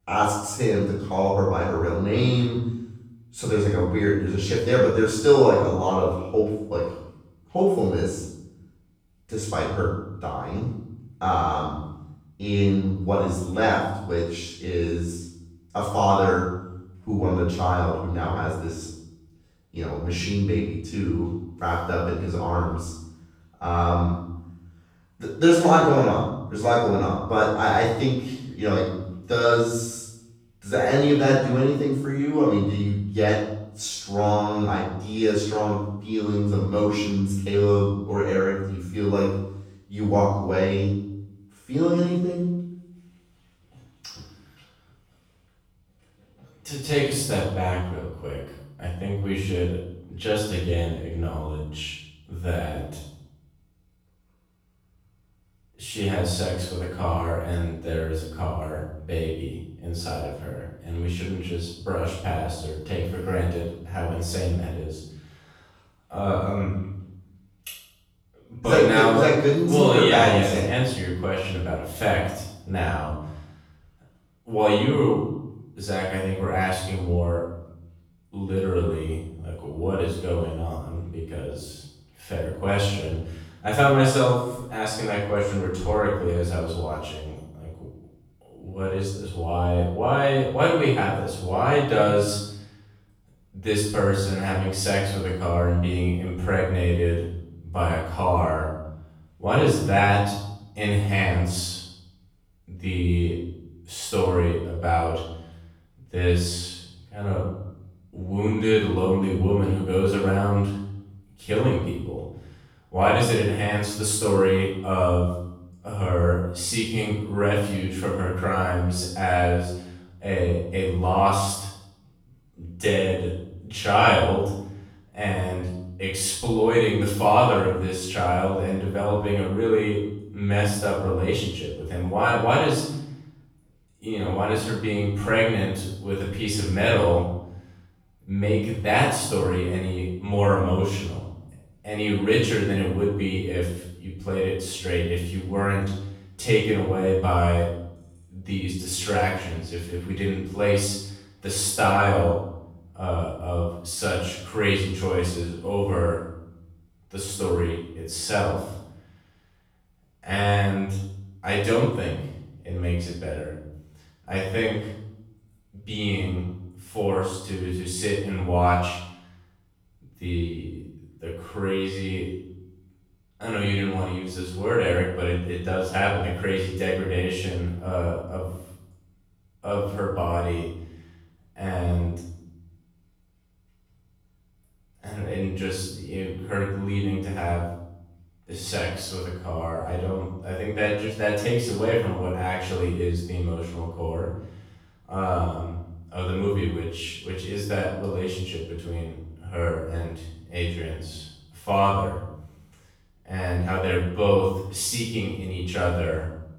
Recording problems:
off-mic speech; far
room echo; noticeable; dies away in 0.7 s

